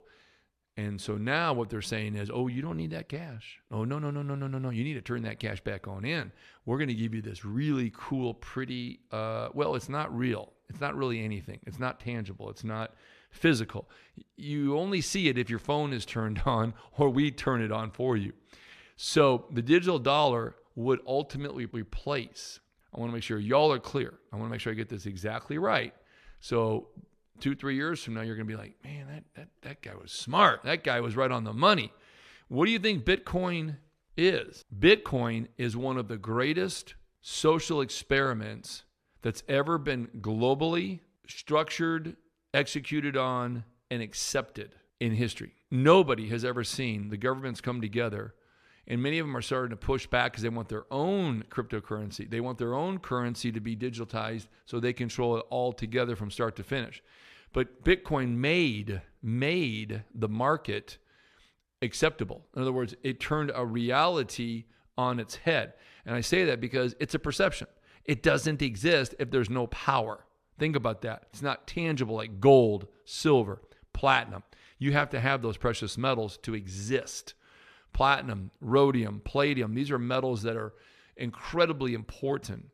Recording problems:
none

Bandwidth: 14 kHz